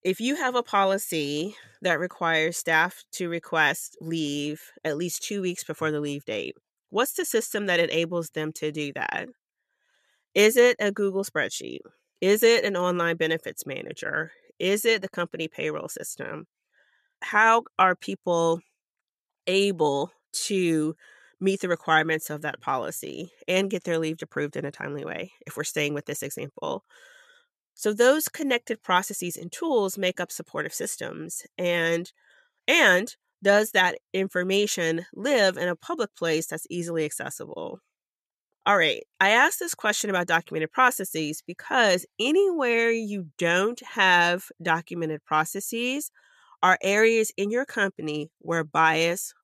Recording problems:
none

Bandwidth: 13.5 kHz